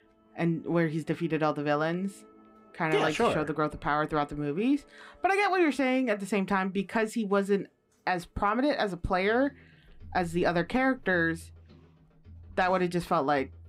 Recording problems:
background music; faint; throughout; 25 dB below the speech

